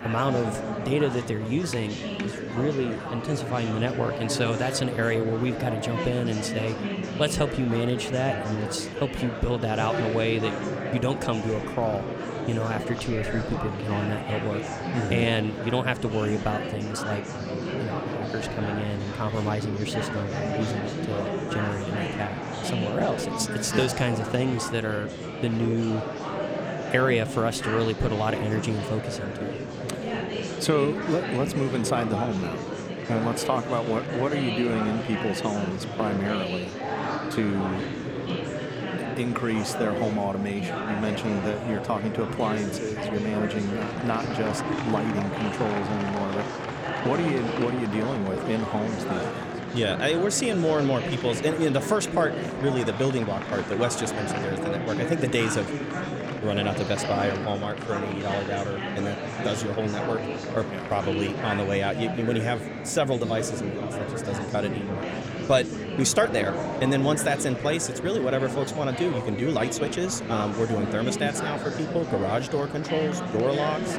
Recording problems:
murmuring crowd; loud; throughout; 3 dB below the speech

